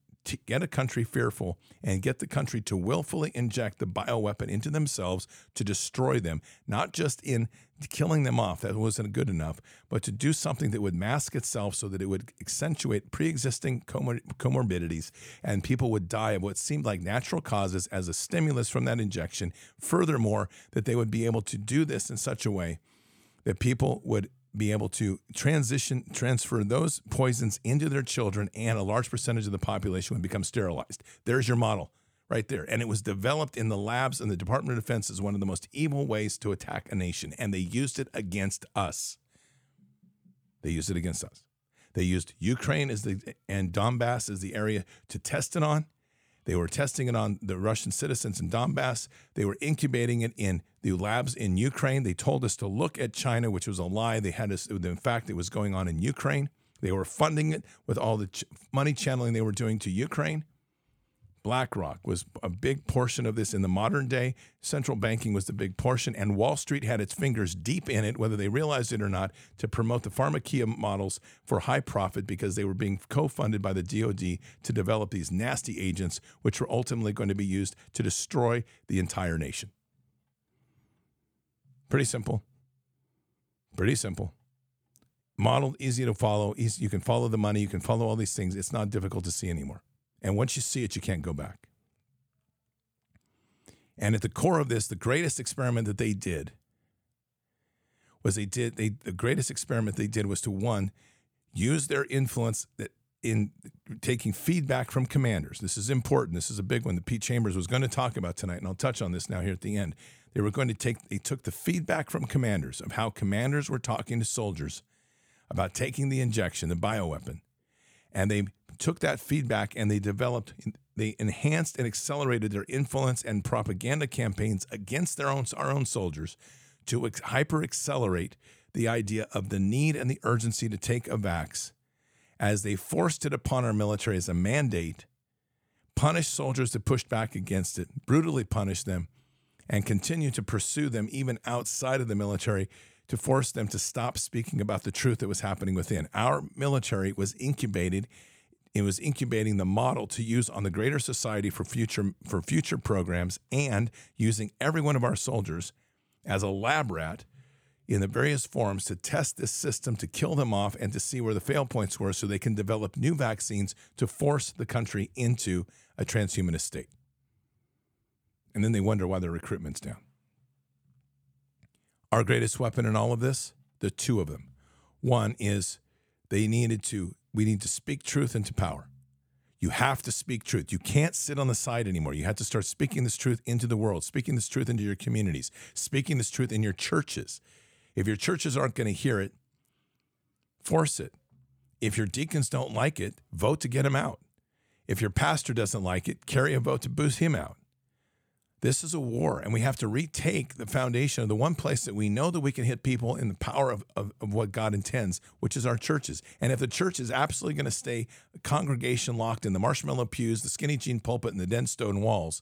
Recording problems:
none

